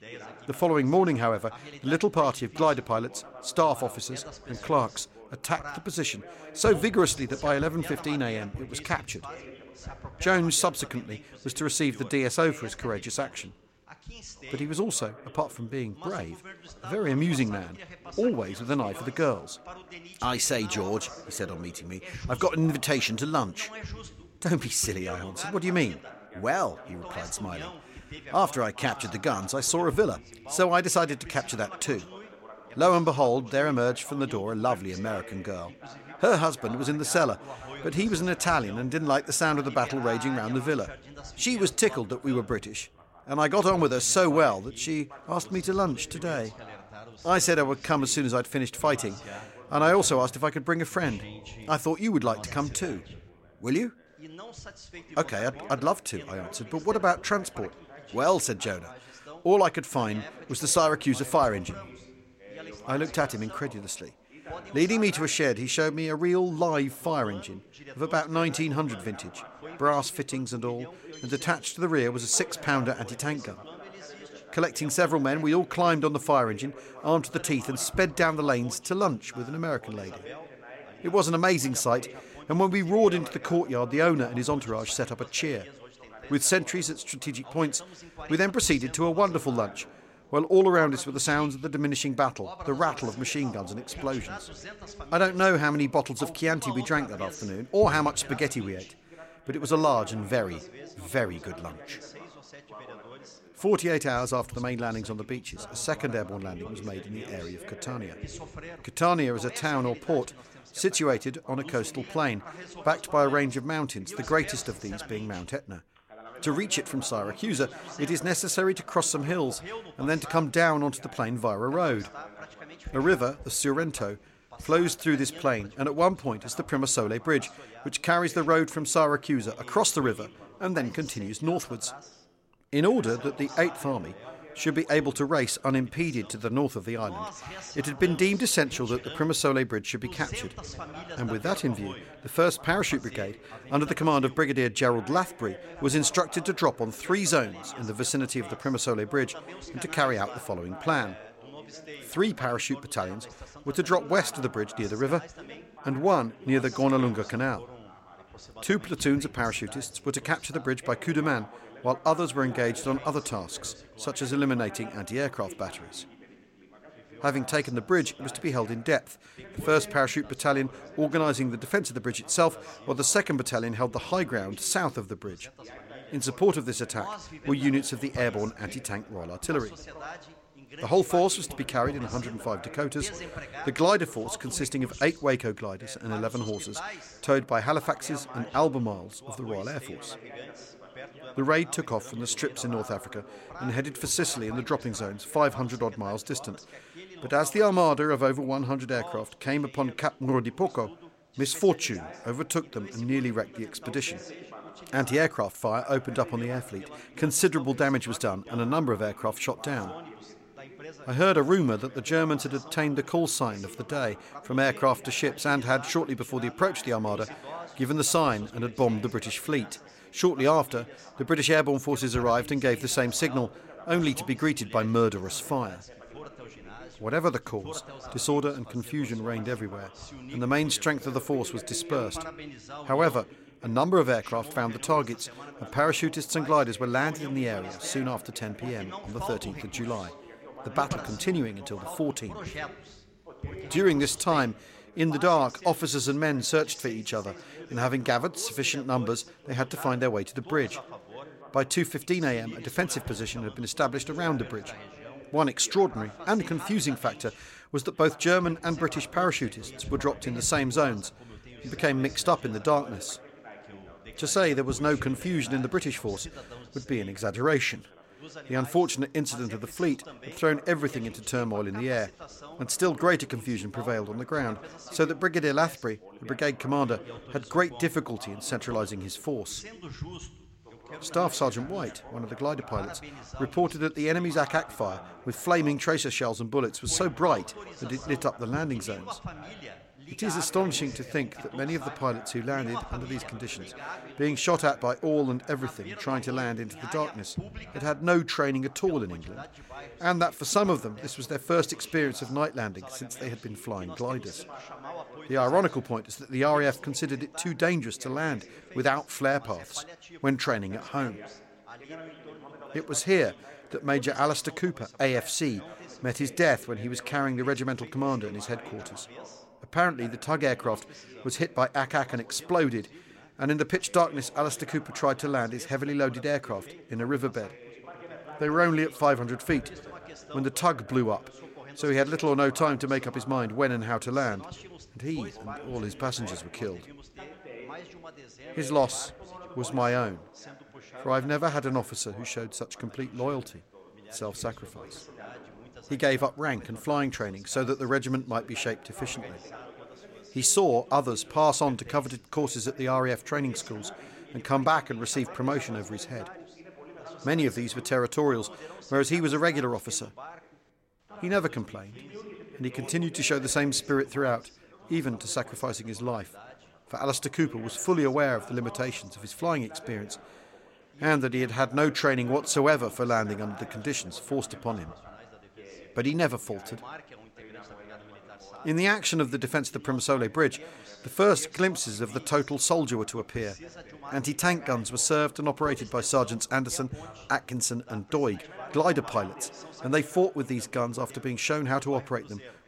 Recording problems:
background chatter; noticeable; throughout; 2 voices, 15 dB below the speech

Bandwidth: 16 kHz